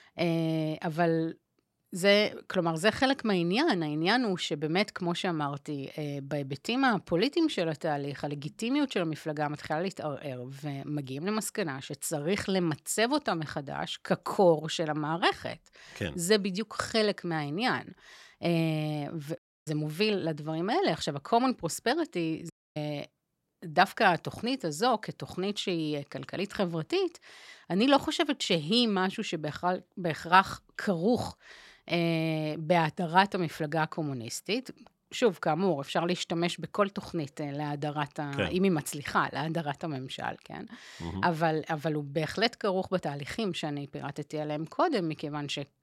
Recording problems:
audio cutting out; at 19 s and at 23 s

